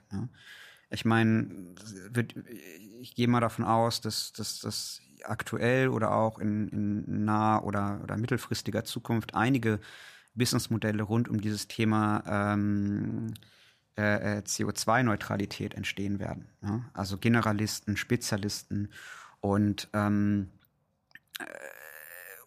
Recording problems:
none

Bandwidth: 14.5 kHz